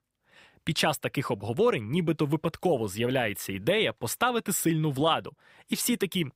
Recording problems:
none

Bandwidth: 15.5 kHz